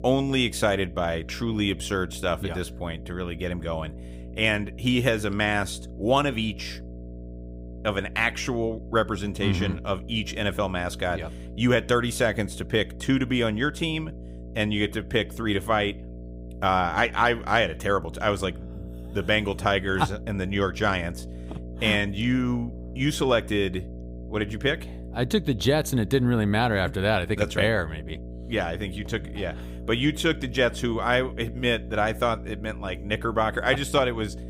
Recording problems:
electrical hum; faint; throughout; 60 Hz, 20 dB below the speech

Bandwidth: 15.5 kHz